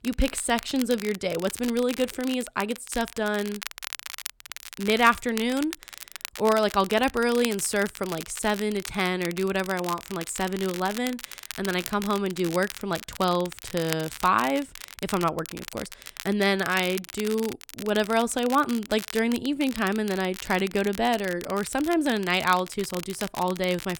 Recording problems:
crackle, like an old record; noticeable; 10 dB below the speech

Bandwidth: 17.5 kHz